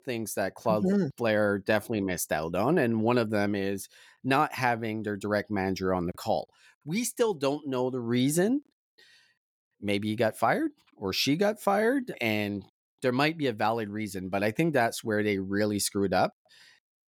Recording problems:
none

